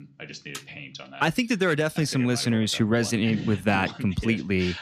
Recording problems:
voice in the background; noticeable; throughout; 15 dB below the speech

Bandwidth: 14.5 kHz